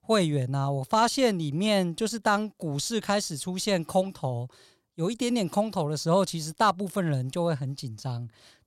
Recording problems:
none

